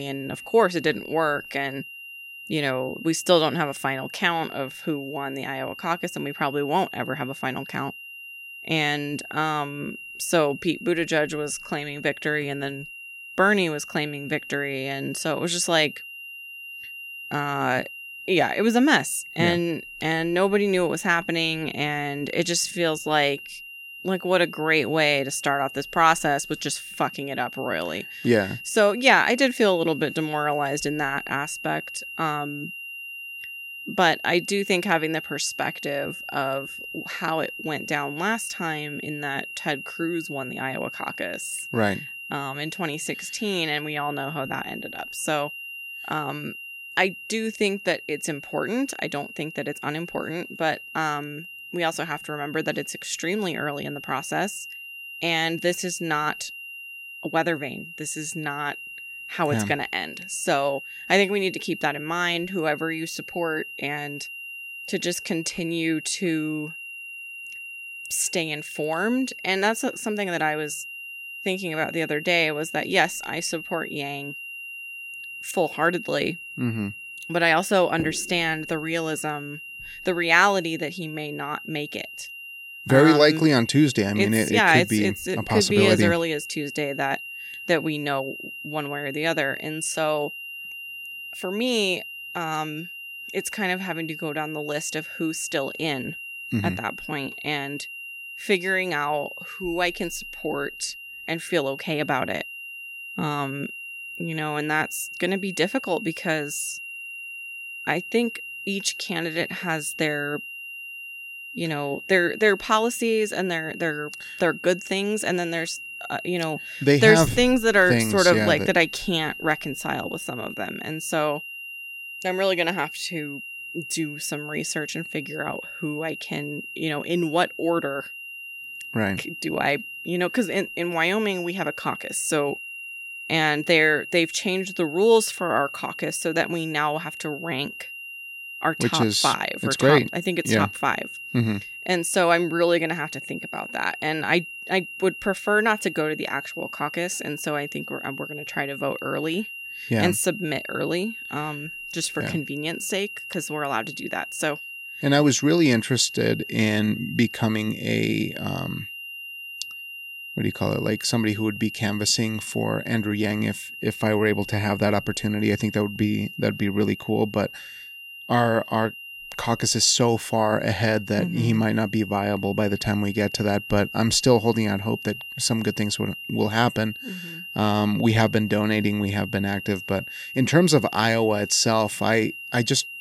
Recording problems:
high-pitched whine; noticeable; throughout; 3 kHz, 10 dB below the speech
abrupt cut into speech; at the start

